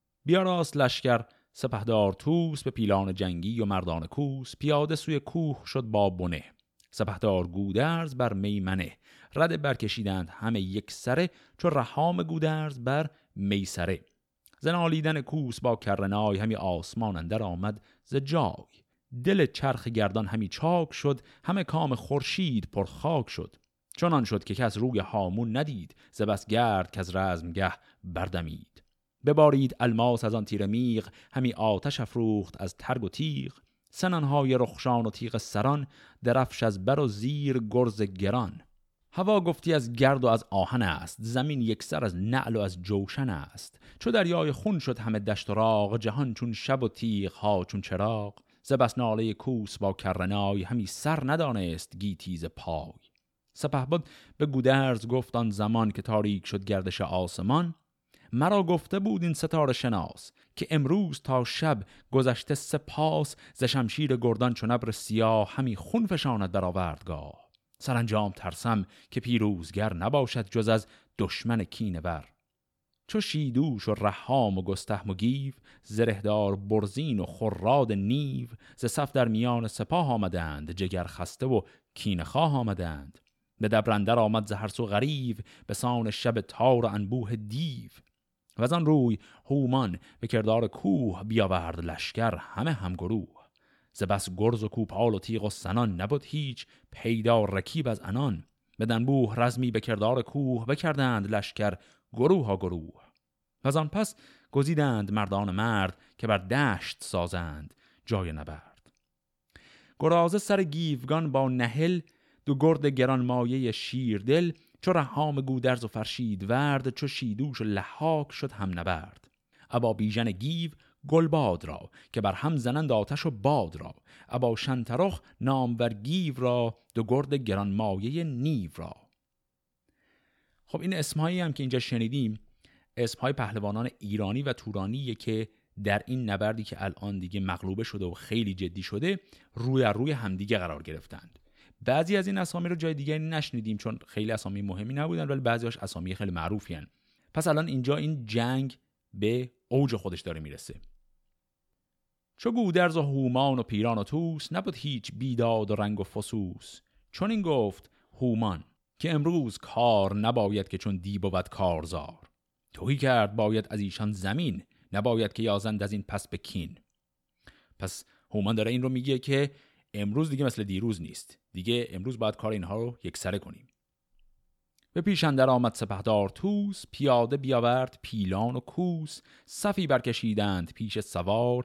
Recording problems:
none

